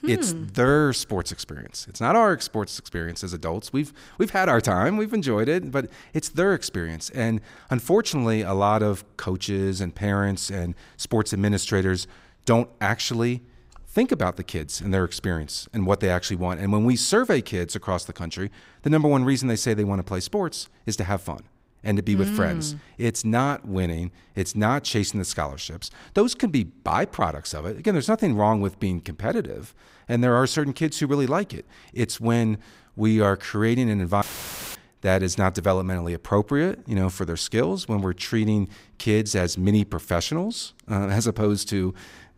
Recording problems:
audio cutting out; filled with static; at 34 s for 0.5 s

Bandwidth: 15.5 kHz